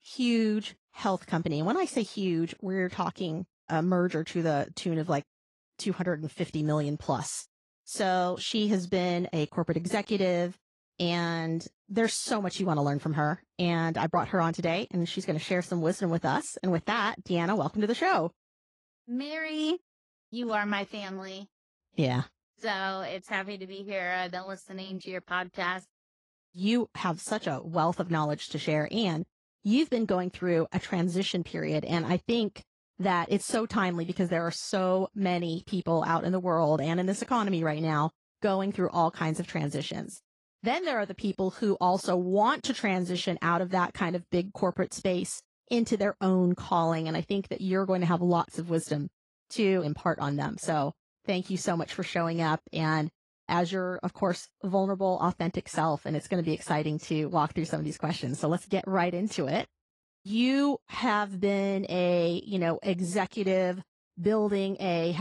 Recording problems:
garbled, watery; slightly; nothing above 10.5 kHz
abrupt cut into speech; at the end

